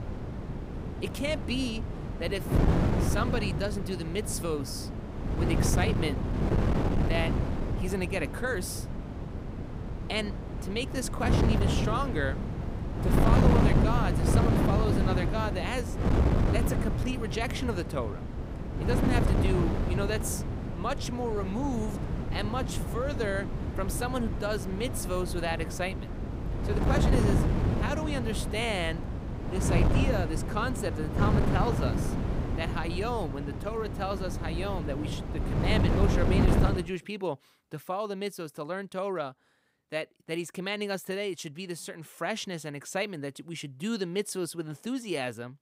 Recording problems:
wind noise on the microphone; heavy; until 37 s; 2 dB below the speech

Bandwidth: 15.5 kHz